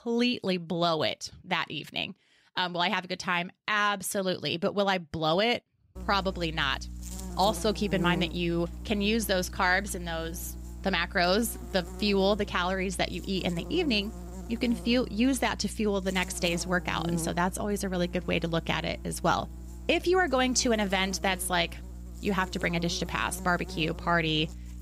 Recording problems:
electrical hum; noticeable; from 6 s on; 60 Hz, 20 dB below the speech

